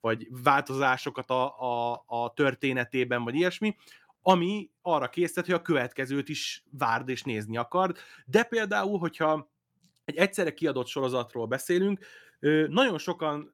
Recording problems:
none

